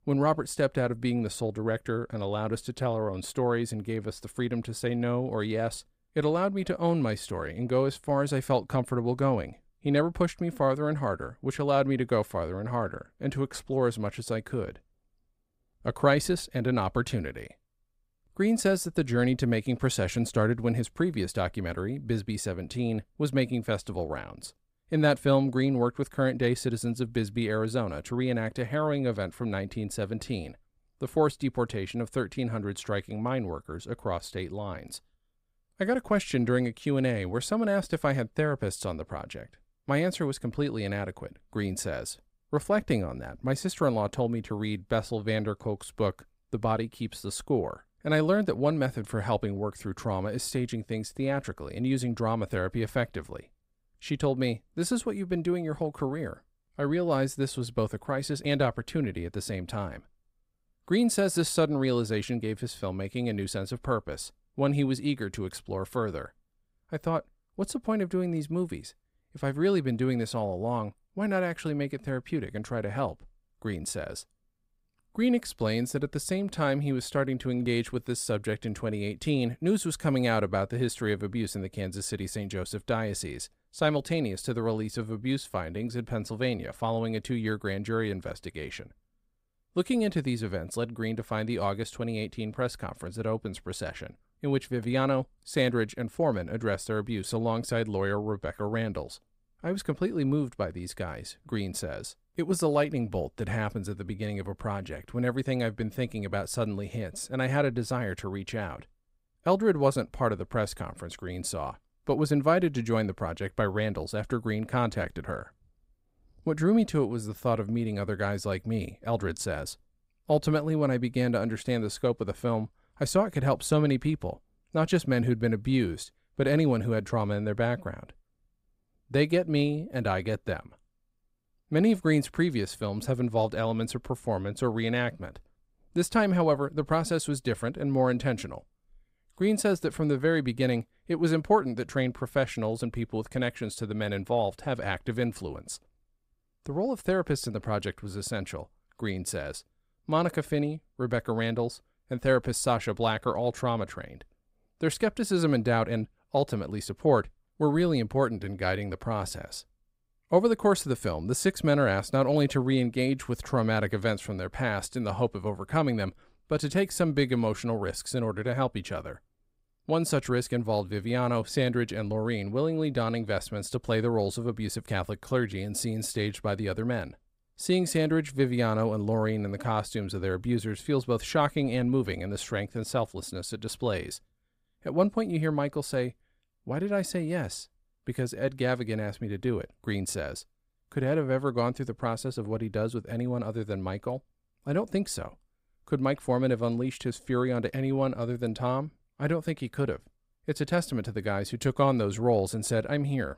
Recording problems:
none

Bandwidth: 15.5 kHz